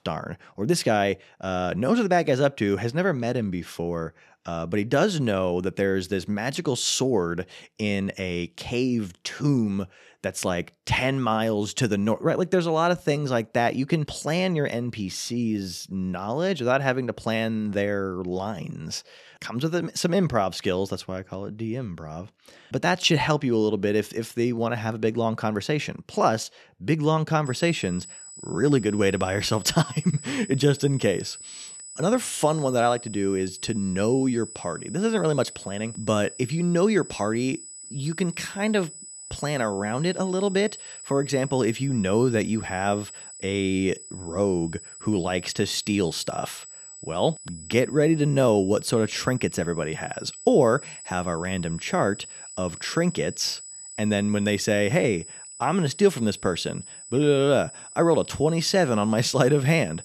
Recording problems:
high-pitched whine; noticeable; from 27 s on; 8 kHz, 15 dB below the speech

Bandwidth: 13.5 kHz